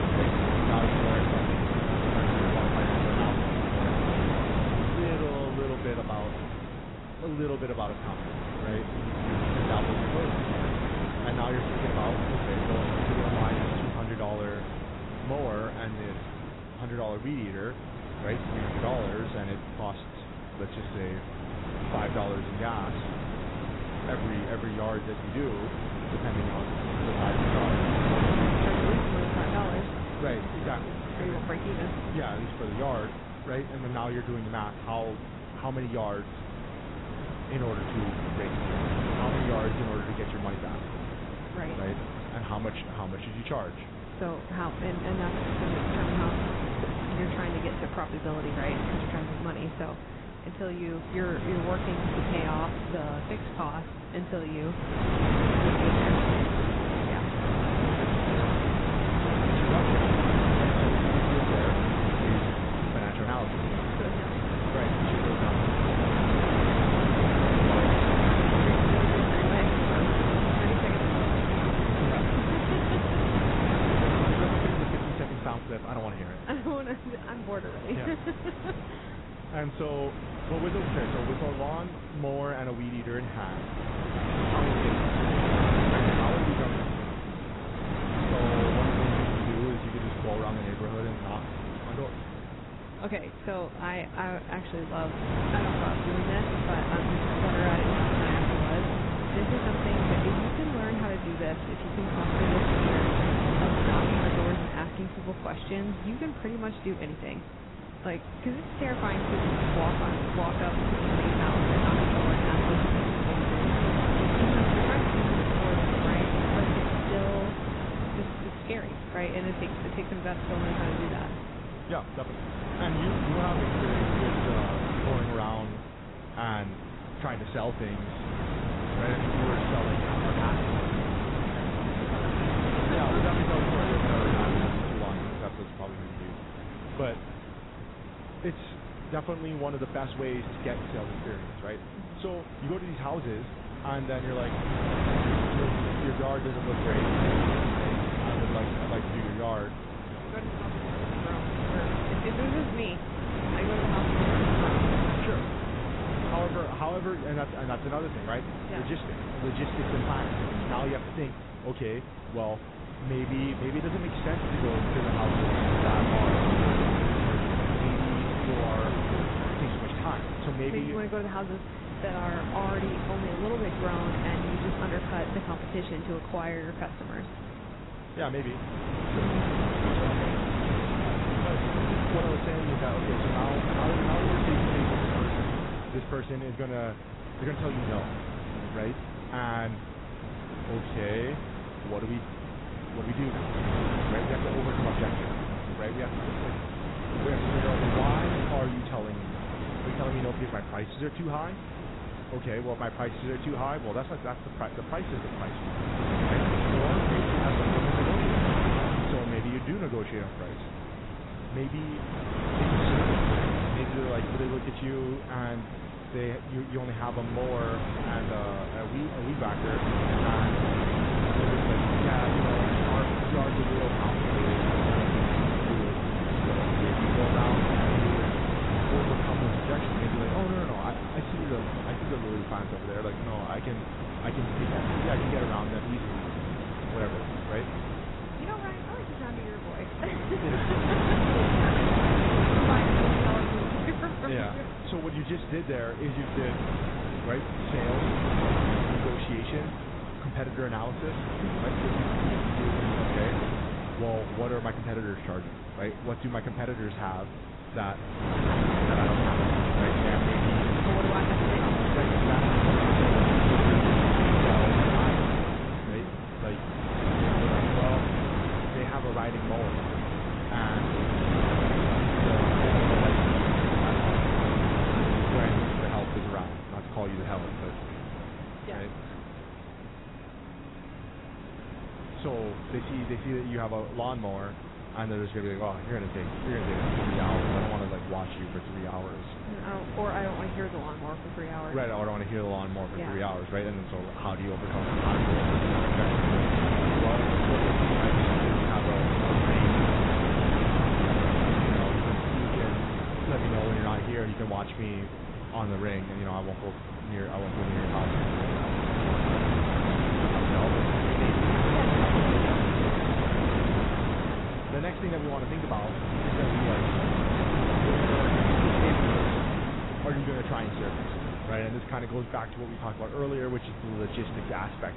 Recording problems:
garbled, watery; badly; nothing above 4 kHz
wind noise on the microphone; heavy; 5 dB above the speech
traffic noise; faint; throughout; 25 dB below the speech

